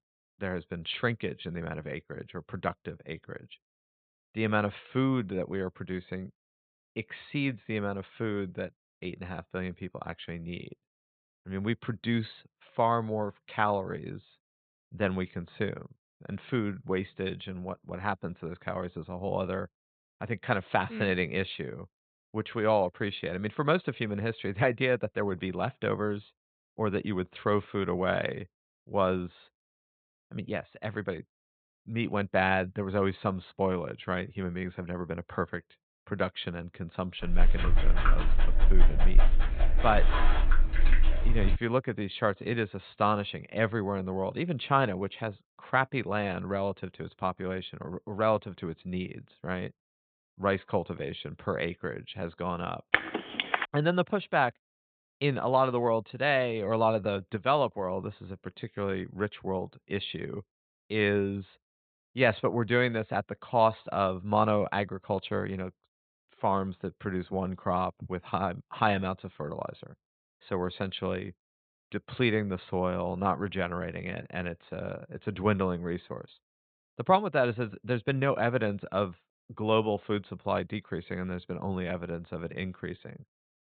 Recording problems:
high frequencies cut off; severe; nothing above 4 kHz
dog barking; loud; from 37 to 42 s; peak 4 dB above the speech
phone ringing; loud; at 53 s; peak 4 dB above the speech

